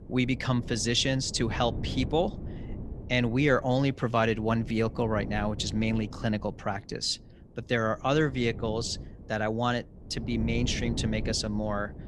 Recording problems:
wind noise on the microphone; occasional gusts; 15 dB below the speech

